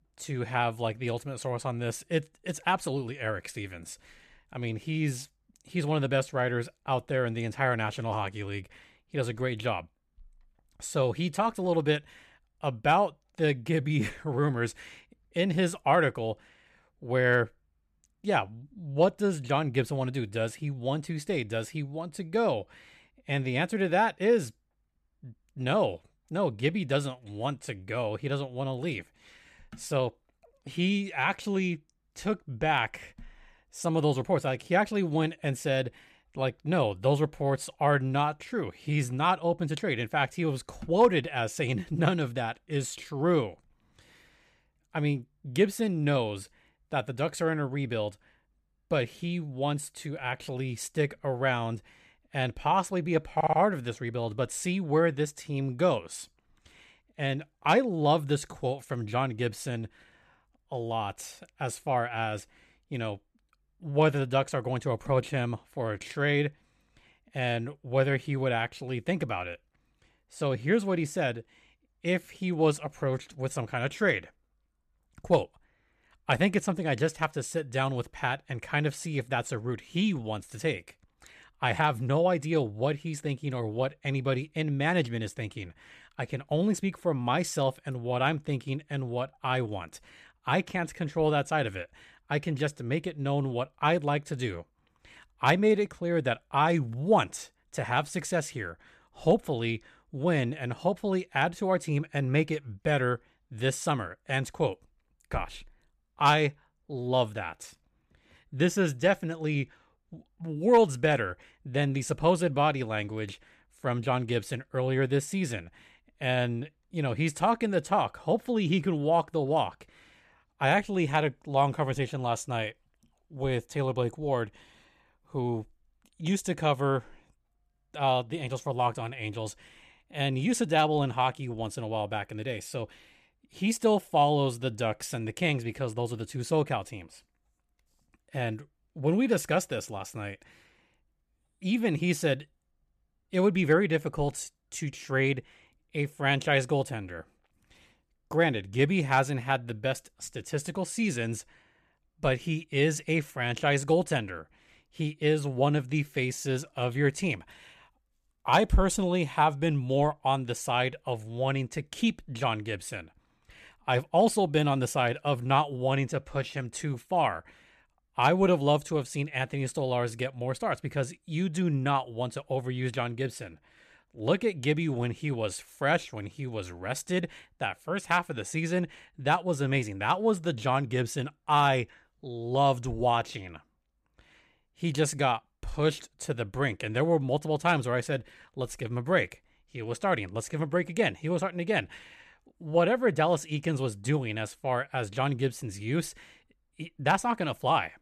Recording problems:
audio stuttering; at 53 s

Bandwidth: 14.5 kHz